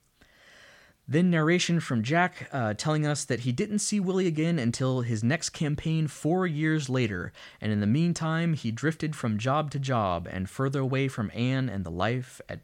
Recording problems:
none

